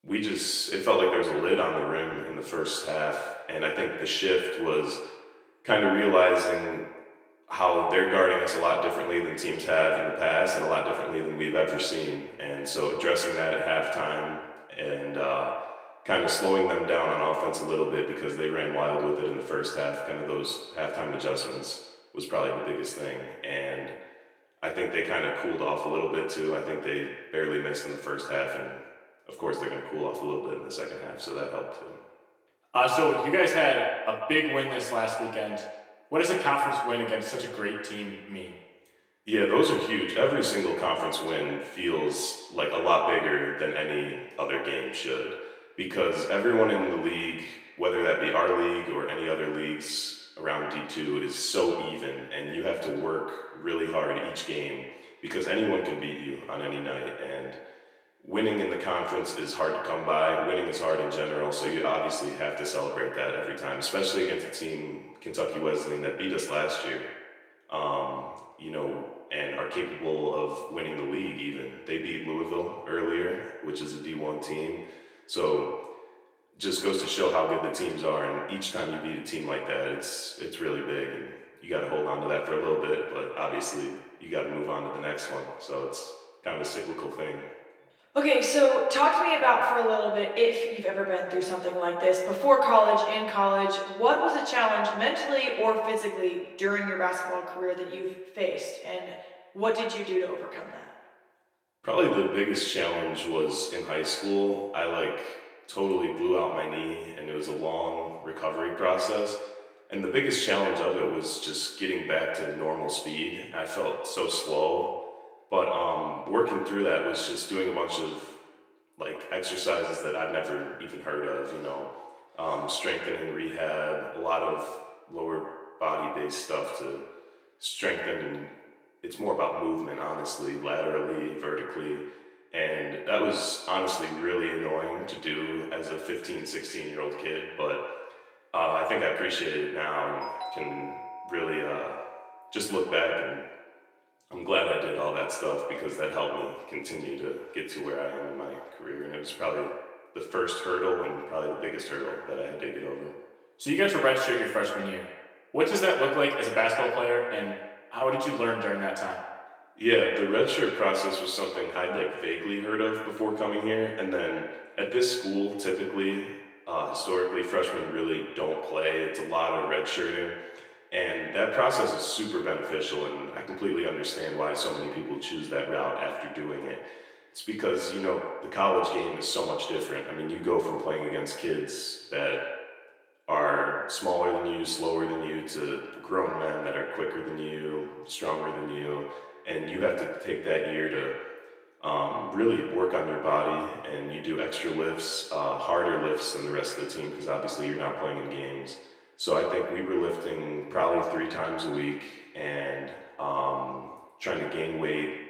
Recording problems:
echo of what is said; strong; throughout; 140 ms later, 7 dB below the speech
off-mic speech; far
thin; somewhat; fading below 400 Hz
room echo; slight; dies away in 0.4 s
garbled, watery; slightly; nothing above 18.5 kHz
doorbell; noticeable; from 2:20 to 2:23; peak 7 dB below the speech

